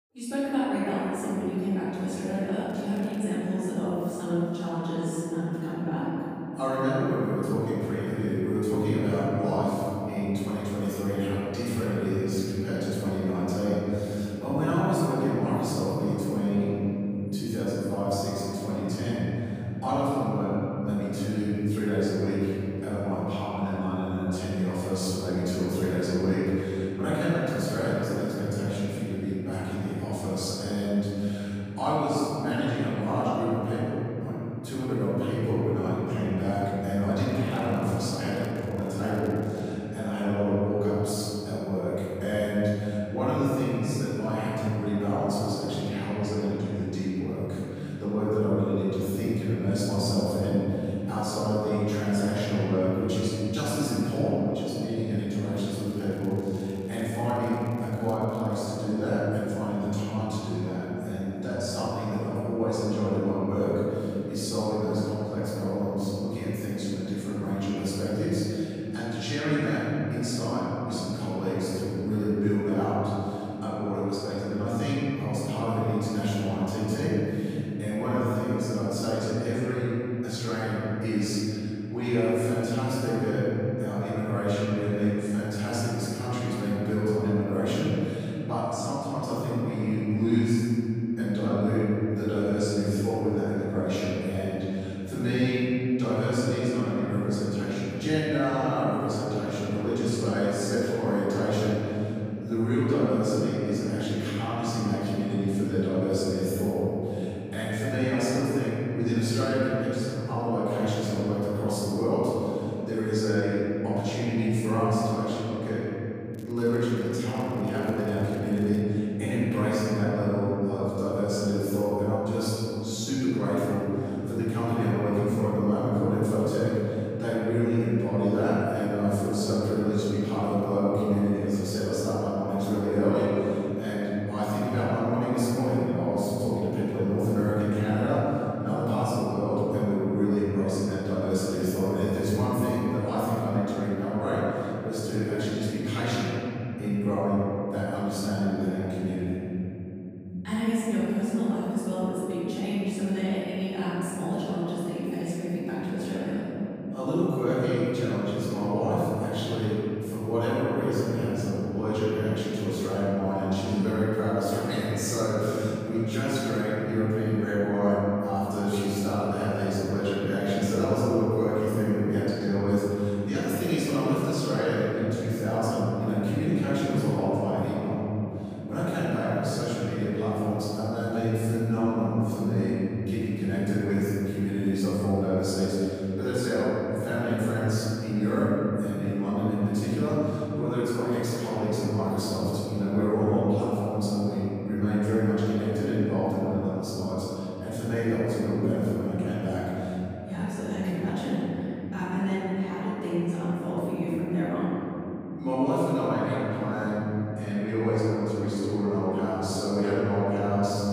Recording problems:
room echo; strong; dies away in 3 s
off-mic speech; far
crackling; faint; 4 times, first at 2.5 s; 30 dB below the speech

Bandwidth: 15 kHz